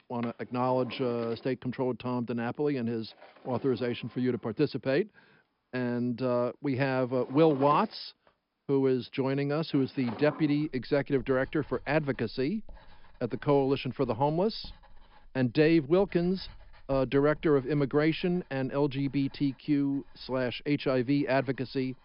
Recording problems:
high frequencies cut off; noticeable; nothing above 5 kHz
garbled, watery; slightly
household noises; faint; throughout; 20 dB below the speech

